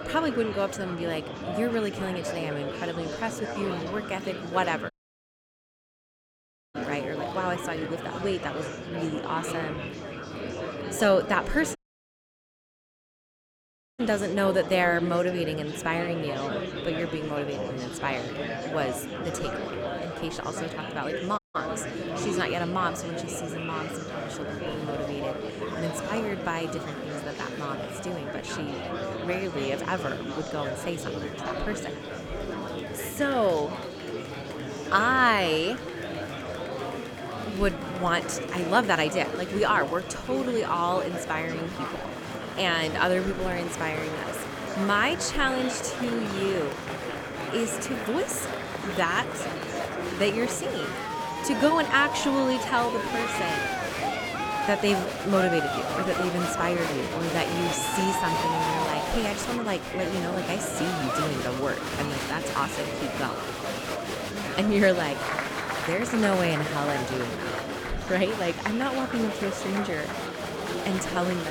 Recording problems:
murmuring crowd; loud; throughout; 4 dB below the speech
high-pitched whine; faint; throughout; 3.5 kHz, 25 dB below the speech
audio cutting out; at 5 s for 2 s, at 12 s for 2 s and at 21 s
abrupt cut into speech; at the end

